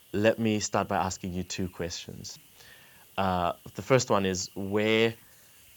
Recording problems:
high frequencies cut off; noticeable; nothing above 8 kHz
hiss; faint; throughout; 25 dB below the speech

